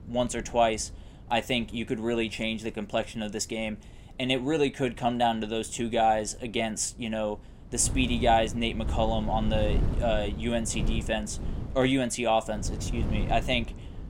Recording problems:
wind noise on the microphone; occasional gusts; 15 dB below the speech

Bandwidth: 16 kHz